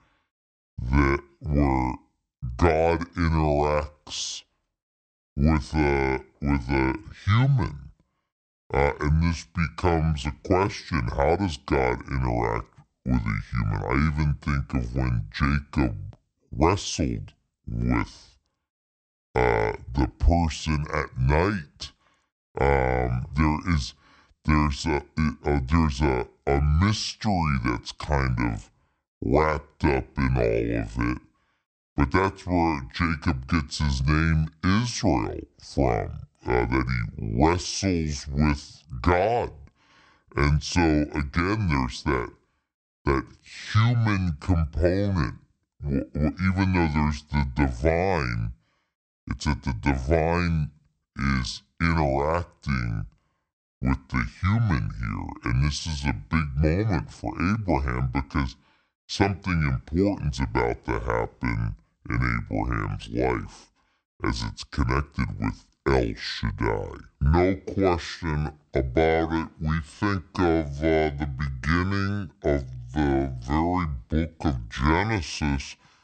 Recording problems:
wrong speed and pitch; too slow and too low; 0.6 times normal speed

